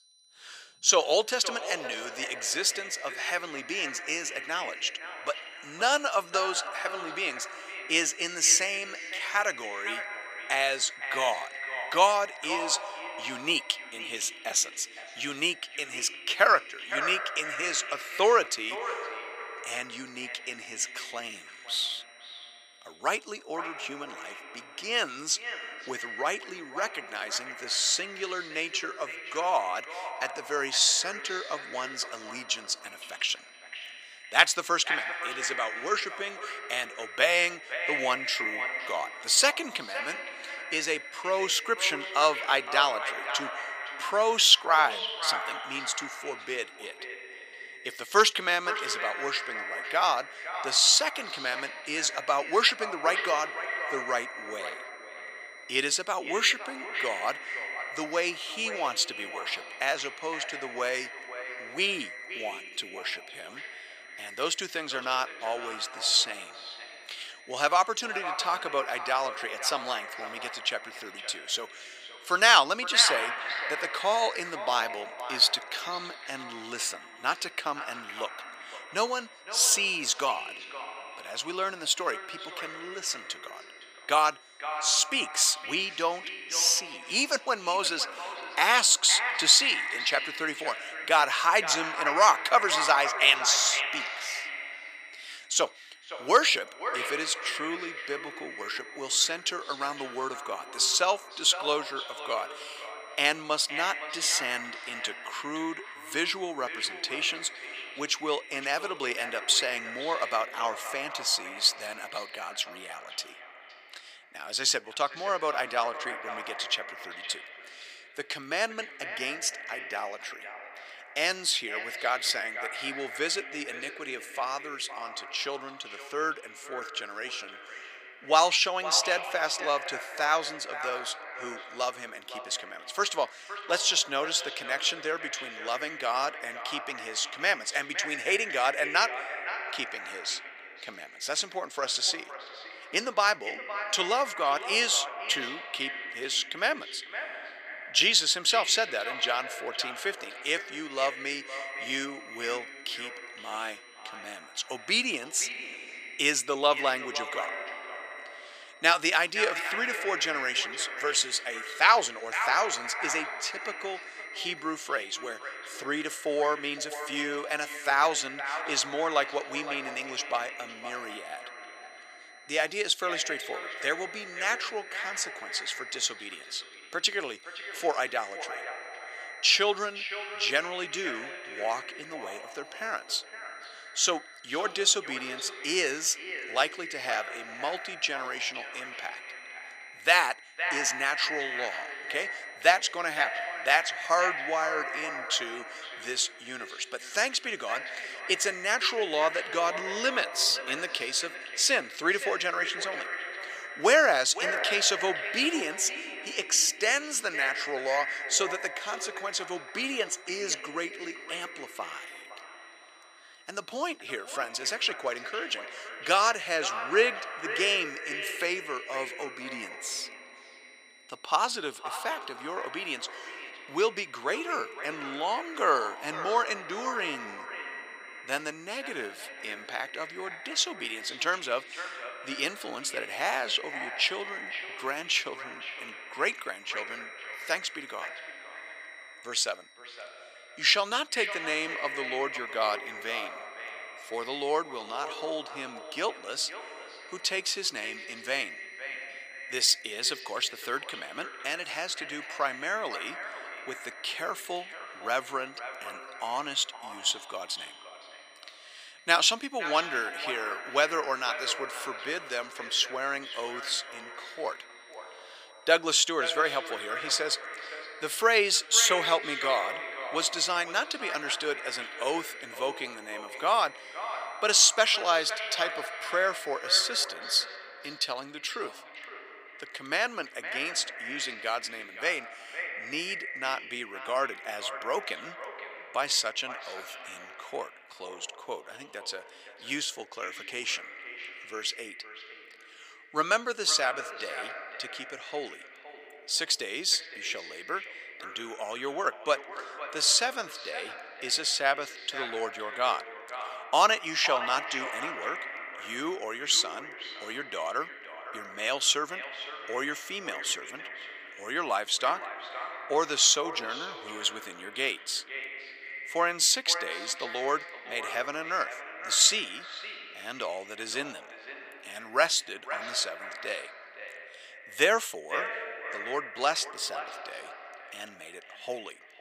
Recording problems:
echo of what is said; strong; throughout; 510 ms later, 10 dB below the speech
thin; very; fading below 650 Hz
high-pitched whine; faint; until 1:50 and from 2:31 to 4:37; 4 kHz, 30 dB below the speech

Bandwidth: 15 kHz